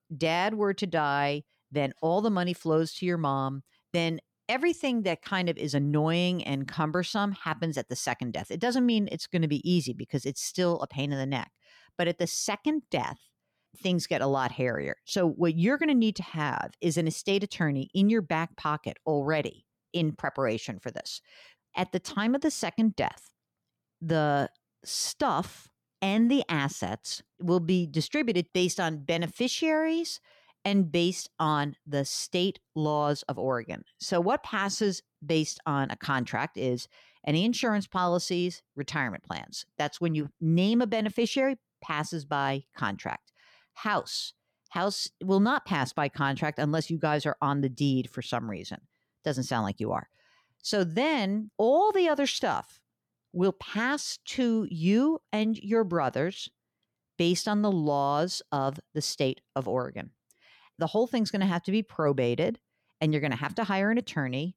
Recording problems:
none

